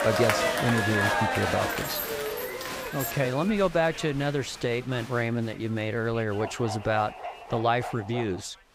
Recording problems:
crowd noise; loud; throughout; 1 dB below the speech
jangling keys; noticeable; from 1.5 to 3 s; peak 5 dB below the speech
dog barking; noticeable; from 6.5 s on; peak 8 dB below the speech

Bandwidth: 15.5 kHz